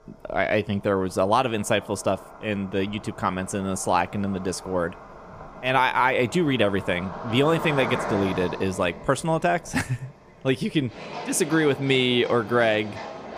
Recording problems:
animal sounds; noticeable; throughout; 15 dB below the speech

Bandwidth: 15 kHz